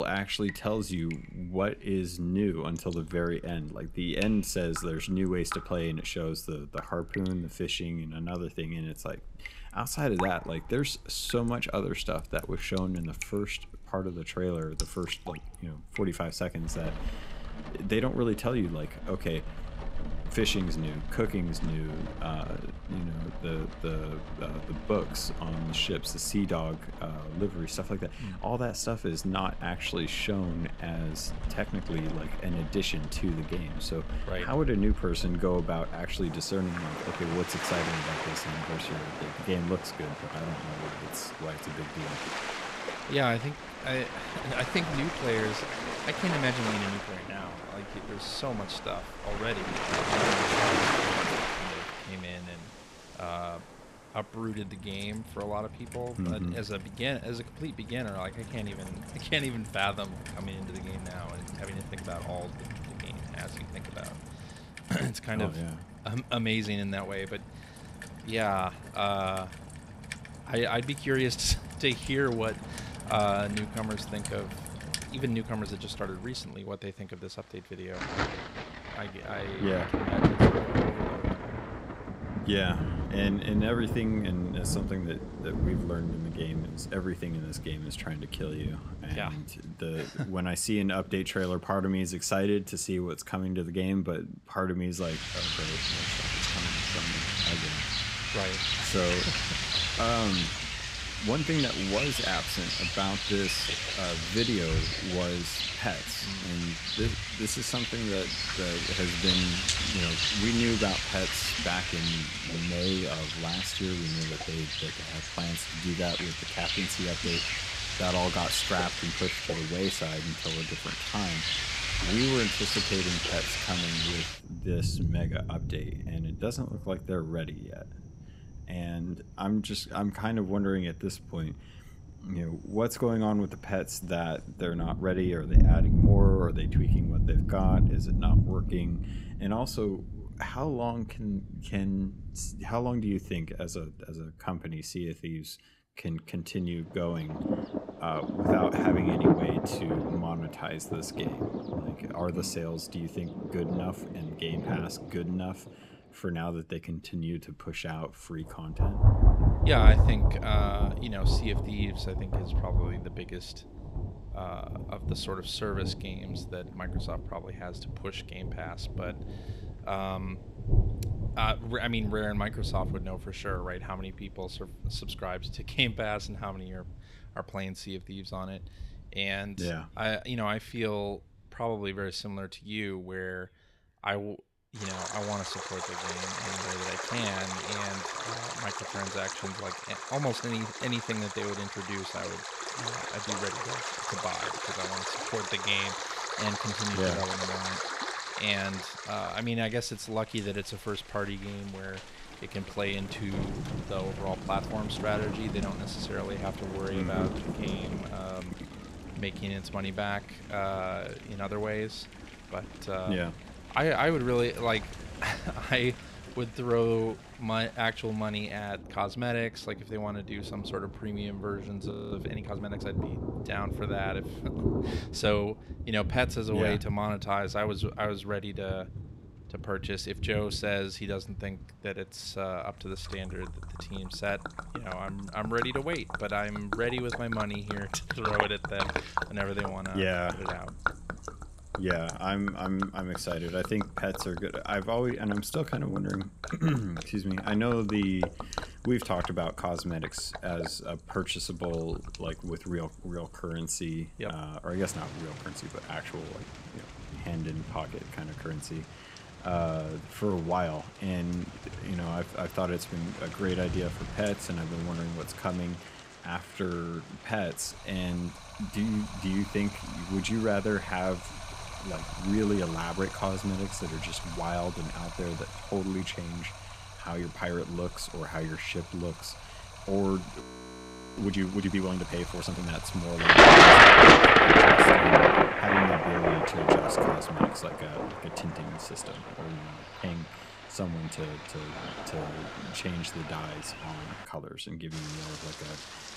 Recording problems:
rain or running water; very loud; throughout; 5 dB above the speech
abrupt cut into speech; at the start
audio freezing; at 3:42 and at 4:40 for 1 s

